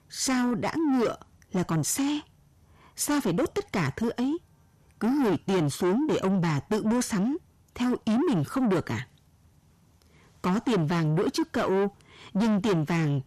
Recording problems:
distortion; heavy; 7 dB below the speech

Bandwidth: 14 kHz